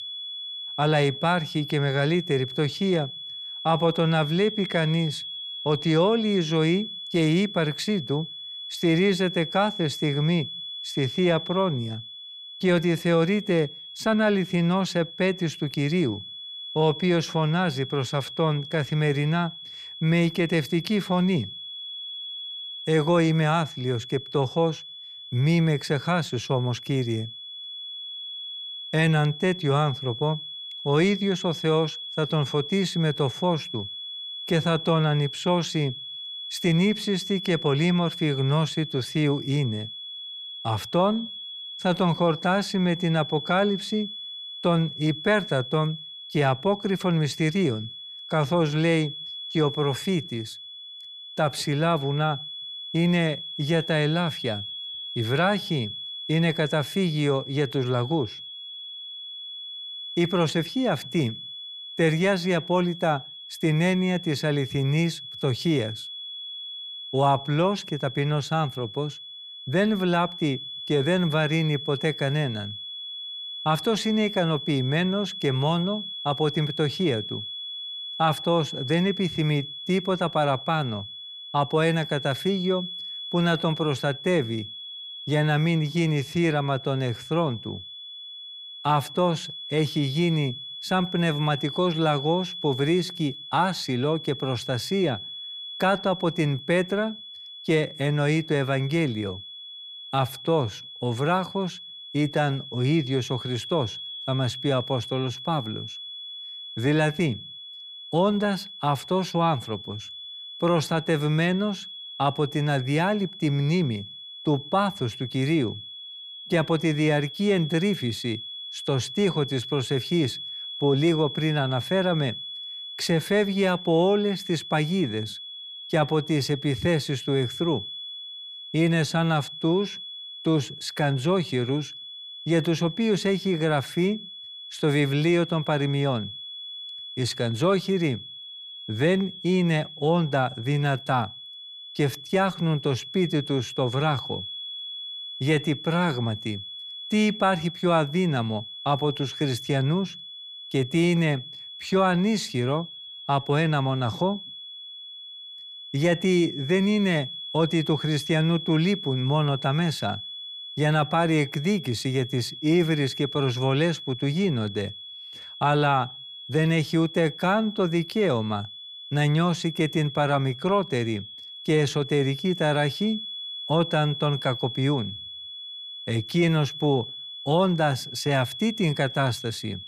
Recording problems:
high-pitched whine; noticeable; throughout; 3.5 kHz, 10 dB below the speech

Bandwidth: 15 kHz